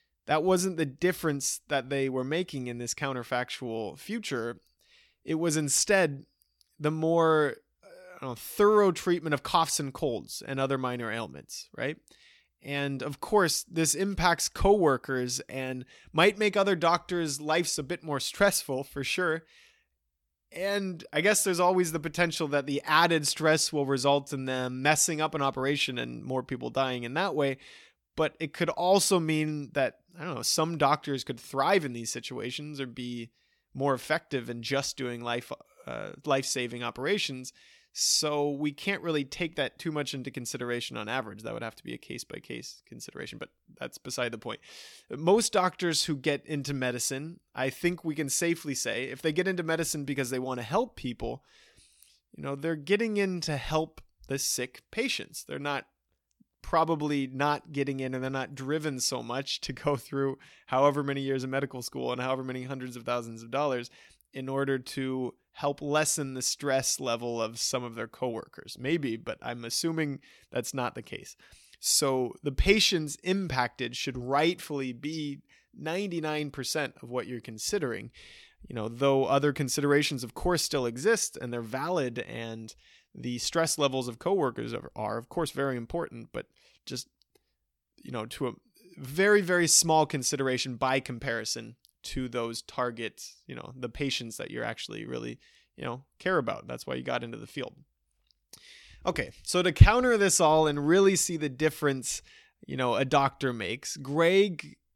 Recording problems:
none

